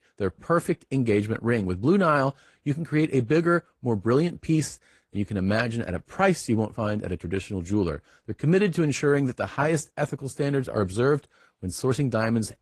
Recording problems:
garbled, watery; slightly; nothing above 14.5 kHz

